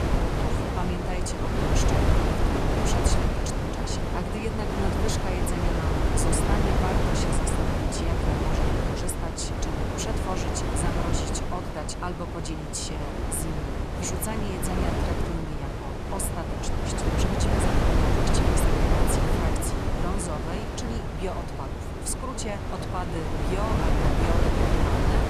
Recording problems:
wind noise on the microphone; heavy; 5 dB above the speech

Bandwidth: 13.5 kHz